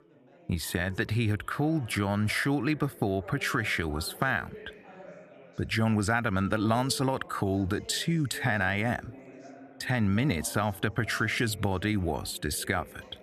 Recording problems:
background chatter; faint; throughout; 4 voices, 20 dB below the speech

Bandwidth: 14 kHz